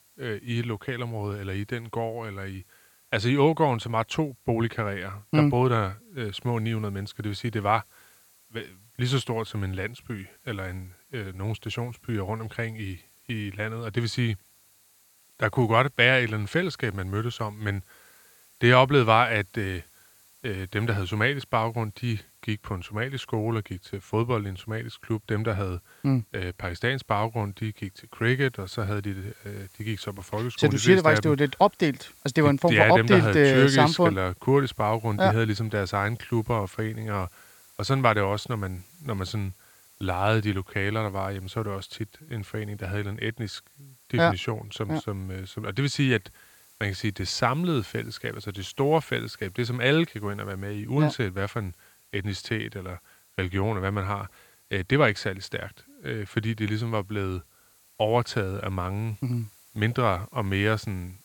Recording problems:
hiss; faint; throughout; 30 dB below the speech

